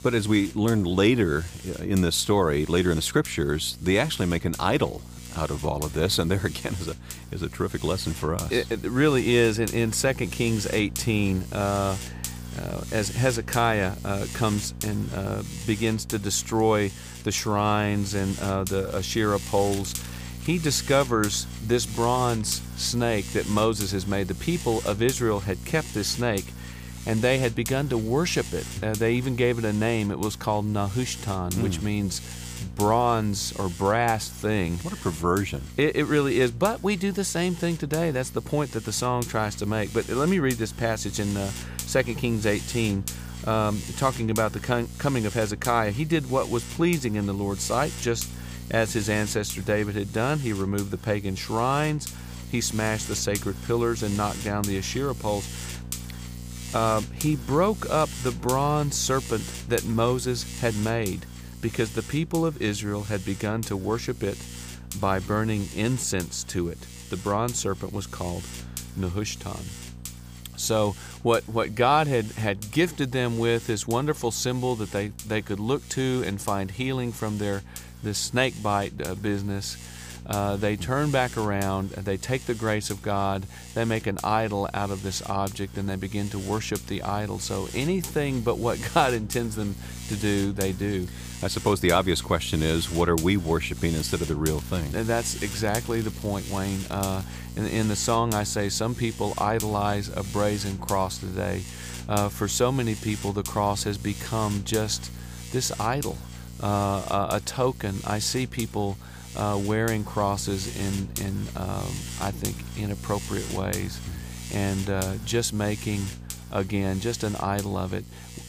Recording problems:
electrical hum; noticeable; throughout; 60 Hz, 15 dB below the speech
crackling; noticeable; from 19 to 20 s and from 1:34 to 1:37; 20 dB below the speech

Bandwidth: 15 kHz